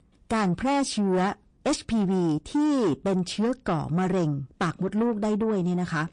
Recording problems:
distortion; slight; 10 dB below the speech
garbled, watery; slightly; nothing above 9 kHz

